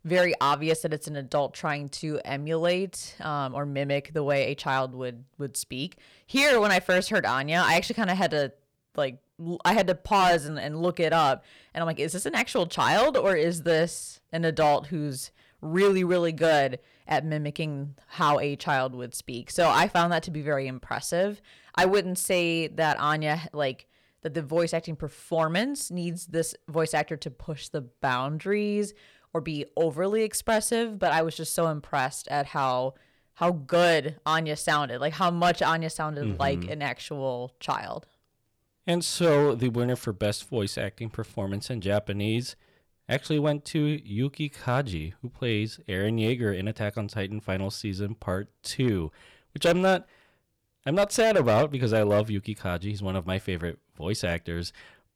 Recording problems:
distortion; slight; 3% of the sound clipped

